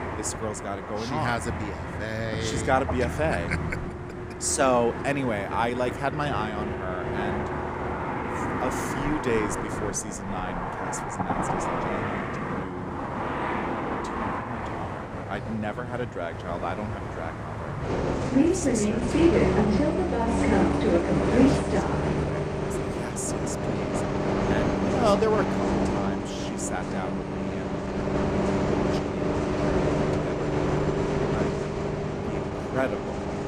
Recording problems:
traffic noise; very loud; throughout; 4 dB above the speech

